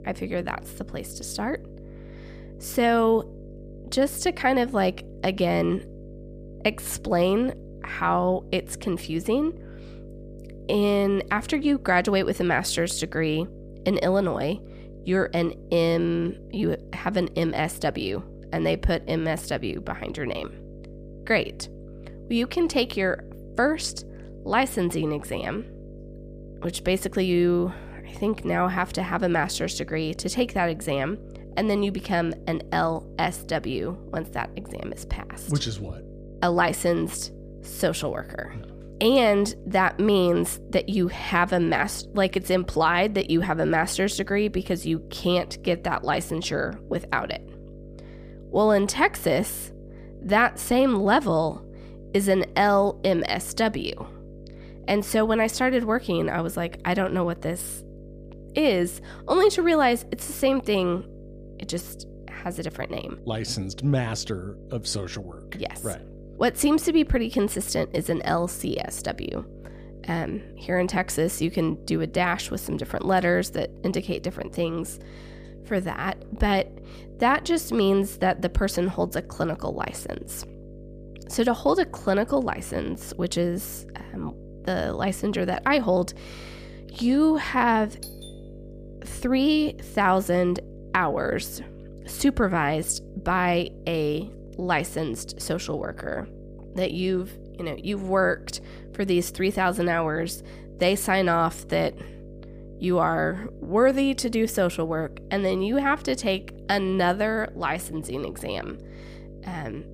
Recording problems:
electrical hum; faint; throughout; 50 Hz, 25 dB below the speech
doorbell; faint; at 1:28; peak 15 dB below the speech

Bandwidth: 15 kHz